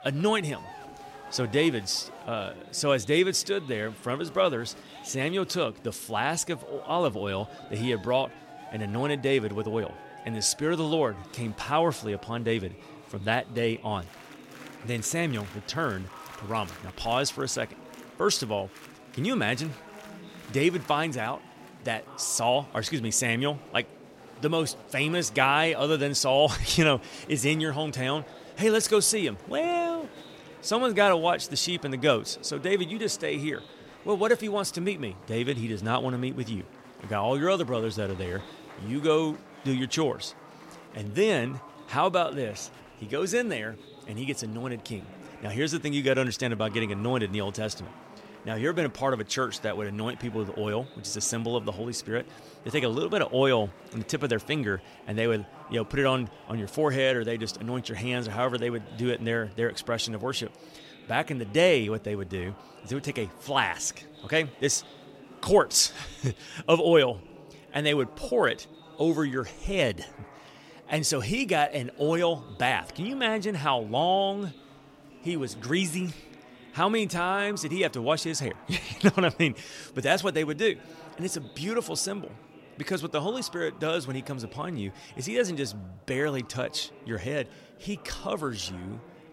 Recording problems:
chatter from many people; noticeable; throughout; 20 dB below the speech

